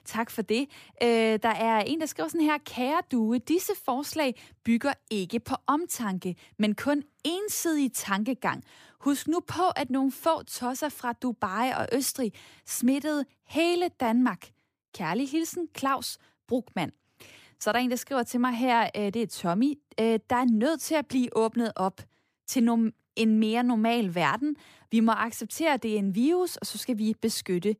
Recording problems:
none

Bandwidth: 15 kHz